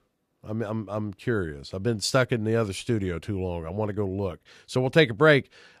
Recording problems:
none

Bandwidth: 14.5 kHz